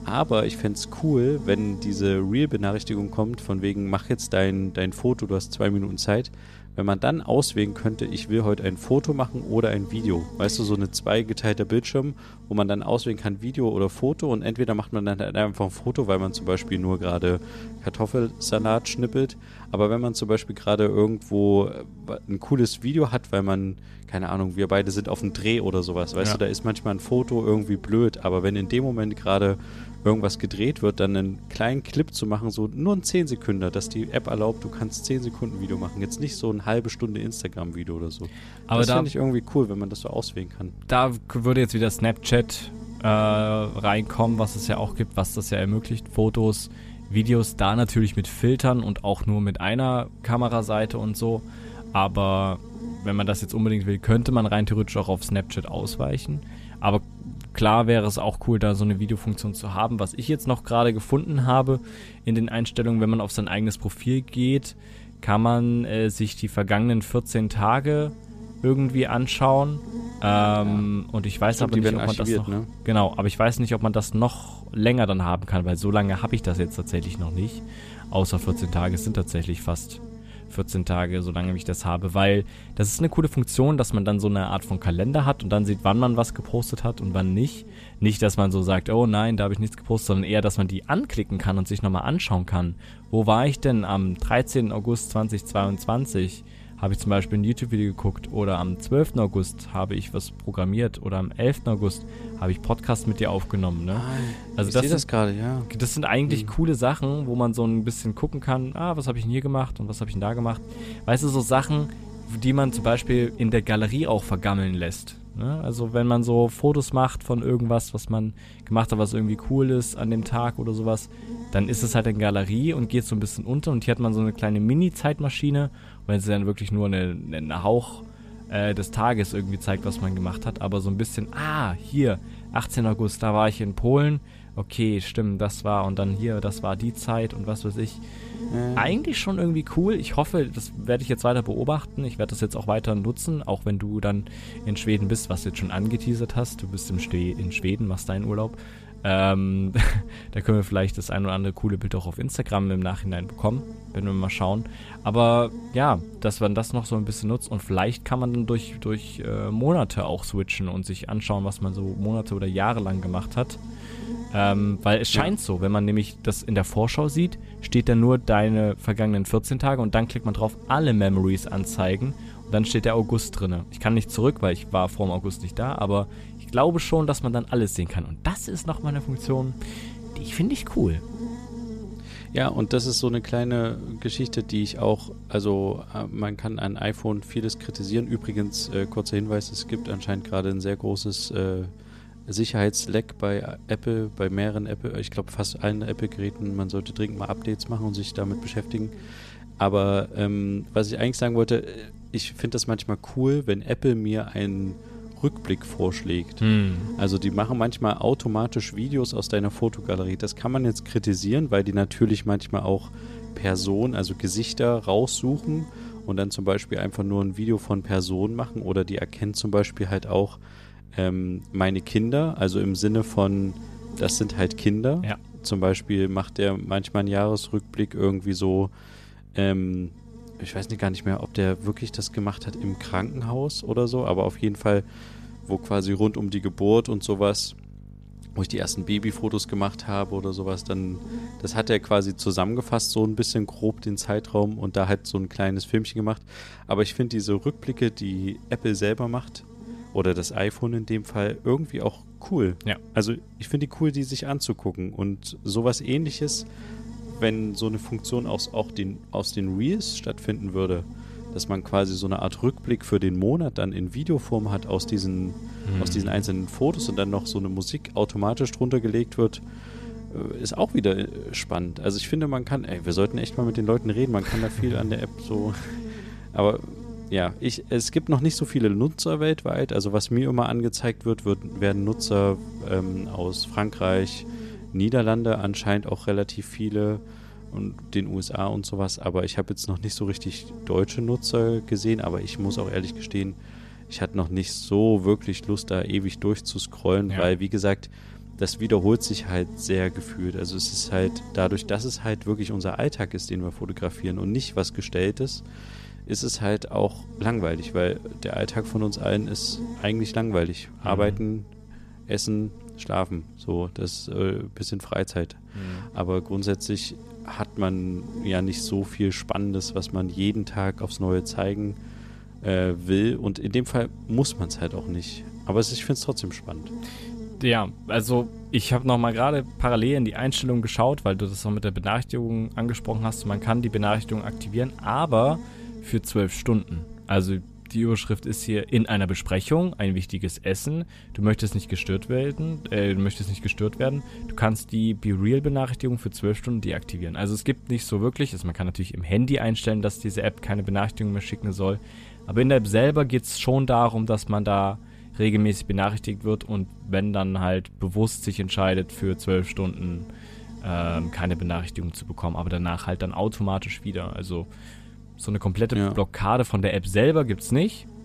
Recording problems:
electrical hum; noticeable; throughout; 50 Hz, 20 dB below the speech

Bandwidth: 14.5 kHz